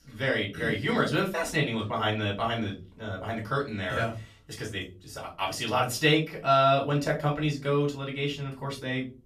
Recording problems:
off-mic speech; far
room echo; slight; dies away in 0.3 s

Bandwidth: 14.5 kHz